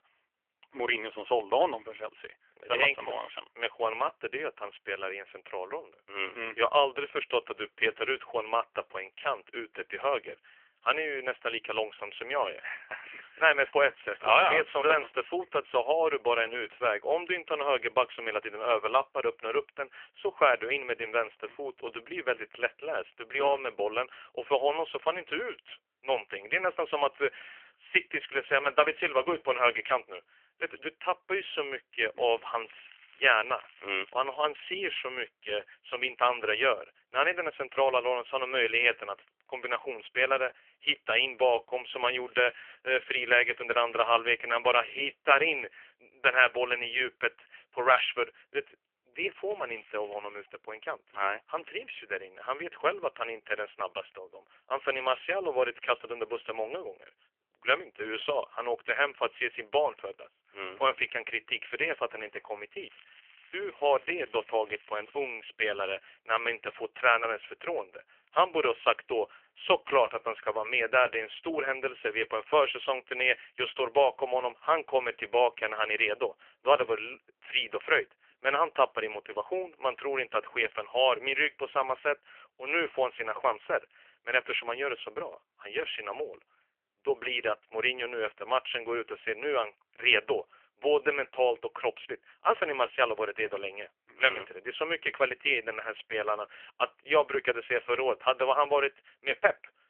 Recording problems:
phone-call audio; poor line; nothing above 3 kHz
muffled; very slightly; fading above 4 kHz
crackling; faint; 4 times, first at 32 s; 25 dB below the speech

